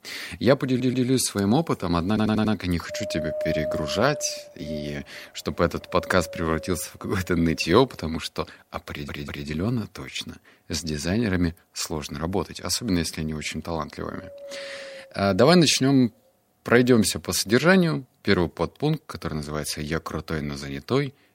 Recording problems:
wind noise on the microphone; heavy; from 3 to 9.5 s and from 13 to 18 s; 8 dB below the speech
audio stuttering; at 0.5 s, at 2 s and at 9 s

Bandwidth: 16 kHz